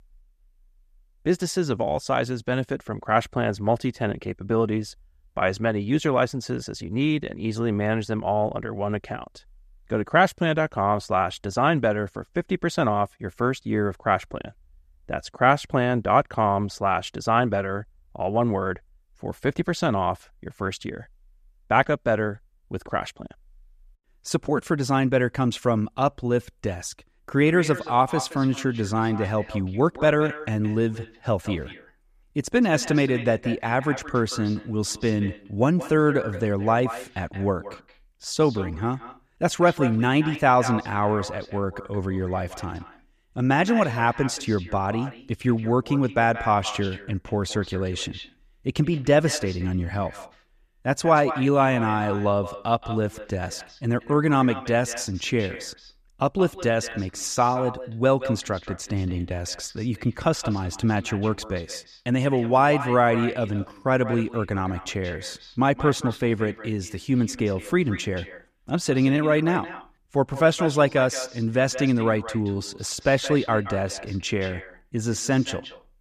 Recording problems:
echo of what is said; noticeable; from 27 s on; 170 ms later, 15 dB below the speech

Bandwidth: 14.5 kHz